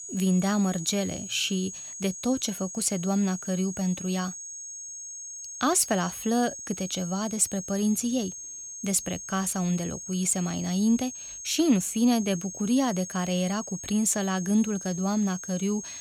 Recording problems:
high-pitched whine; loud; throughout; 6.5 kHz, 10 dB below the speech

